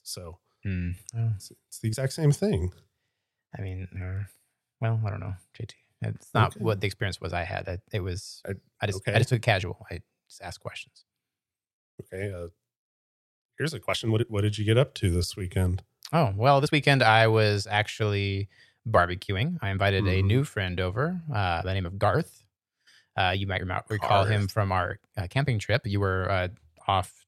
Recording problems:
uneven, jittery; strongly; from 0.5 to 26 s

